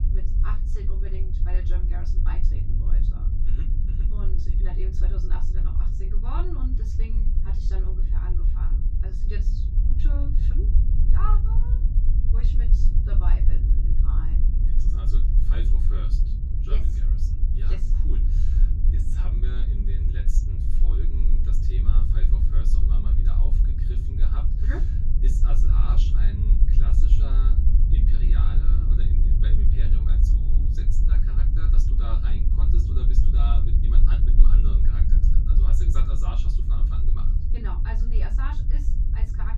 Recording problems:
off-mic speech; far
room echo; very slight; dies away in 0.2 s
low rumble; loud; throughout; 1 dB below the speech

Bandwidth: 14.5 kHz